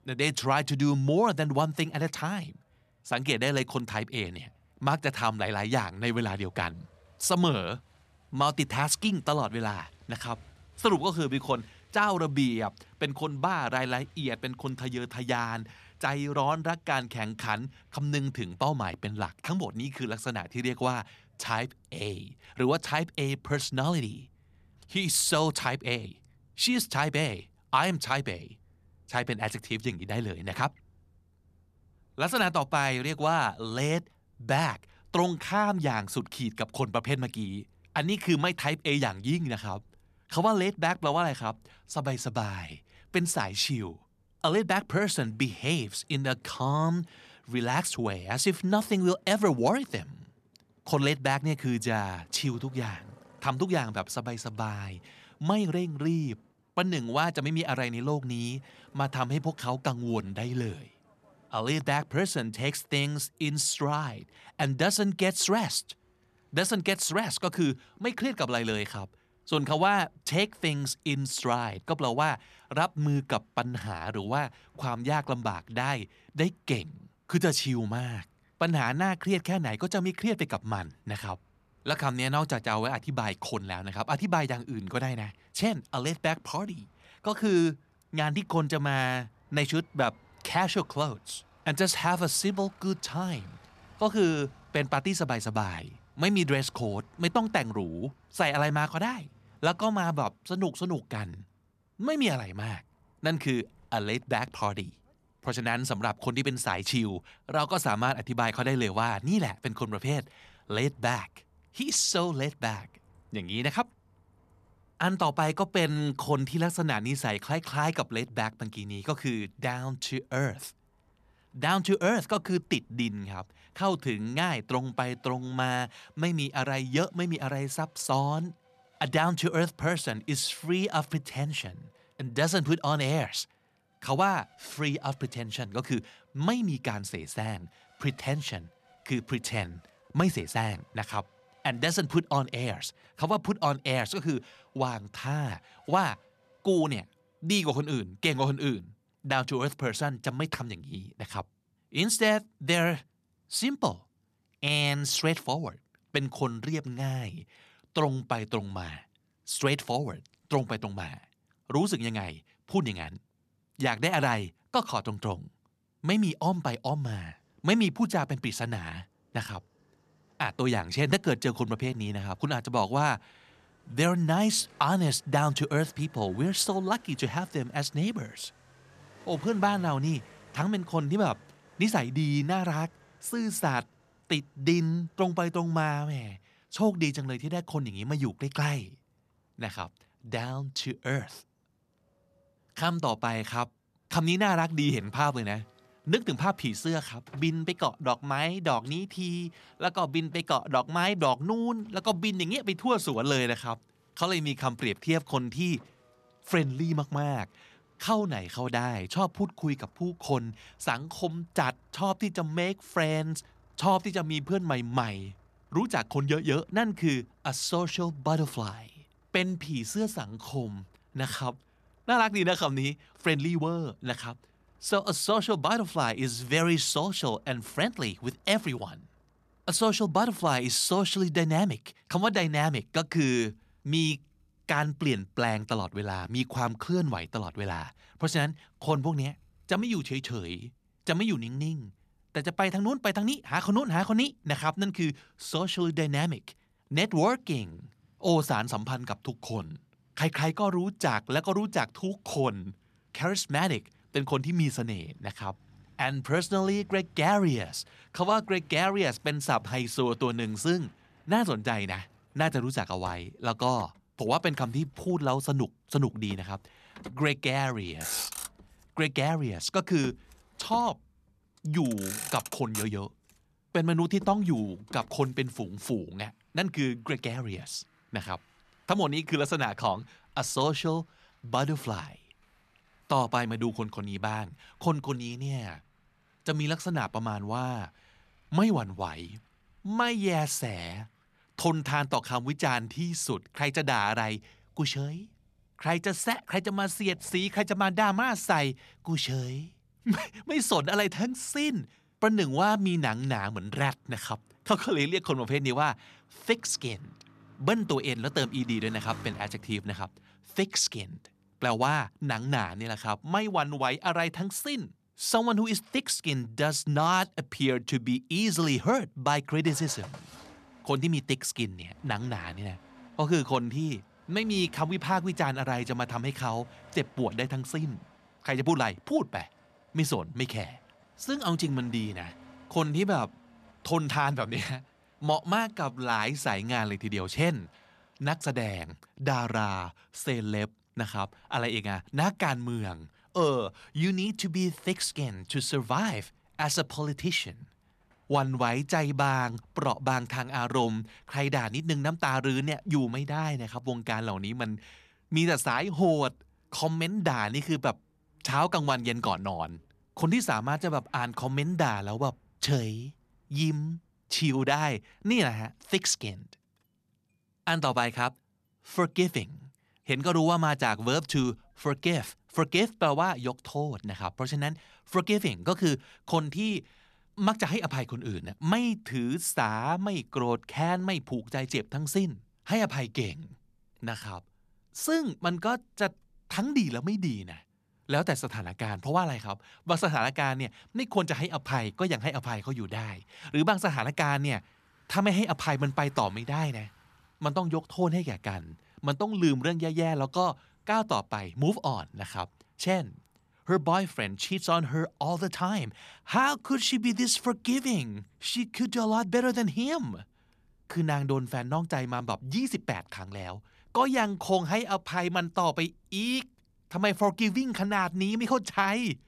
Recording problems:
traffic noise; faint; throughout; 25 dB below the speech

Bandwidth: 14 kHz